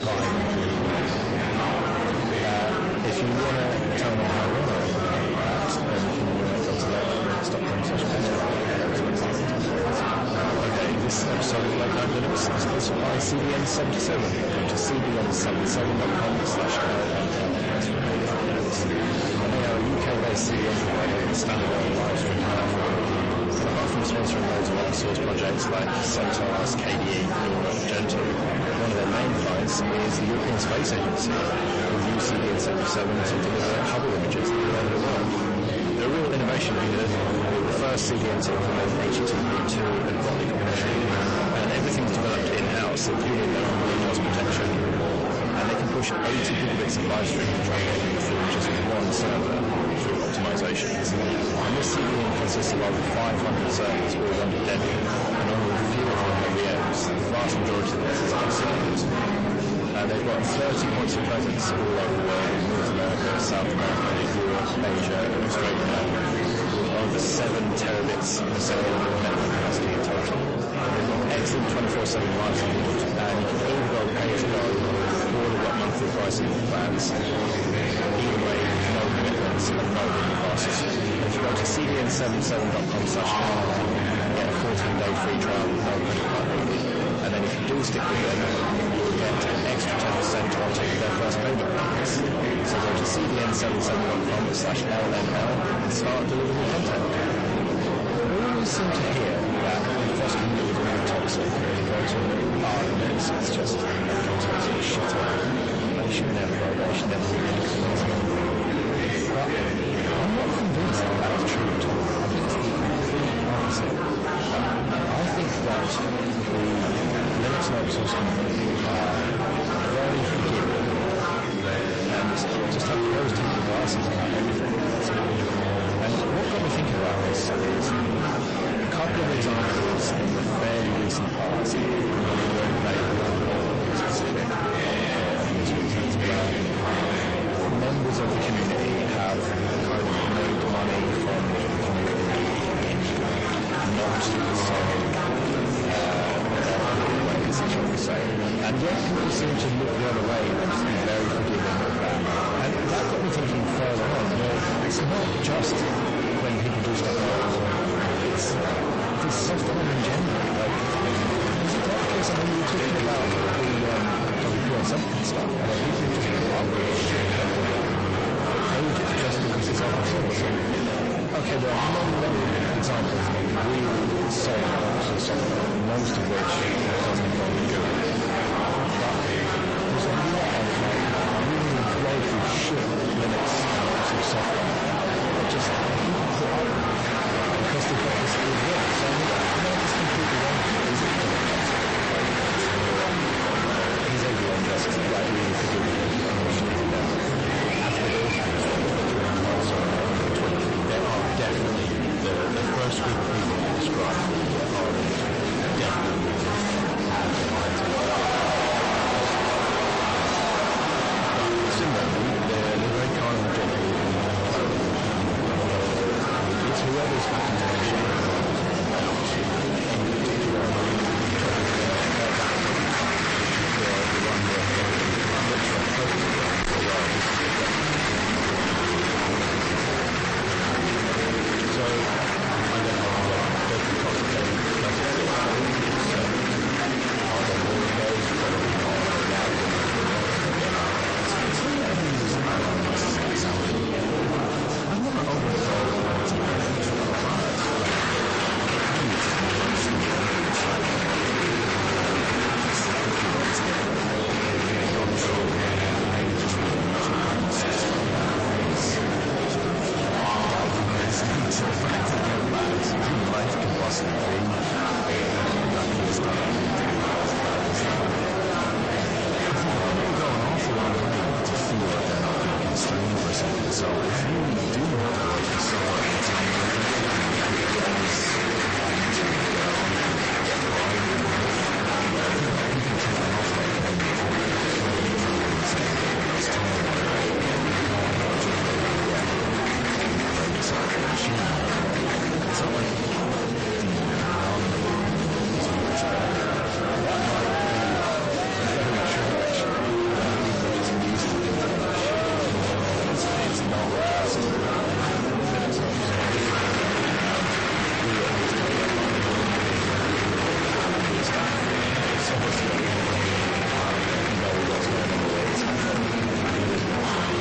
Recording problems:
distortion; heavy; 45% of the sound clipped
garbled, watery; slightly; nothing above 8 kHz
murmuring crowd; very loud; throughout; 3 dB above the speech

